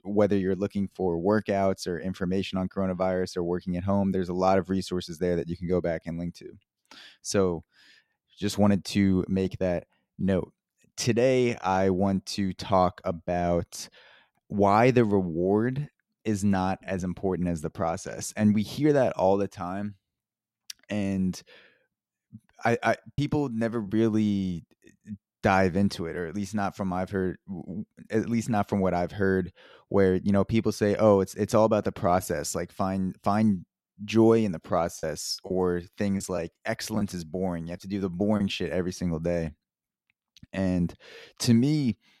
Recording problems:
choppy; very; at 23 s and from 35 to 38 s; 5% of the speech affected

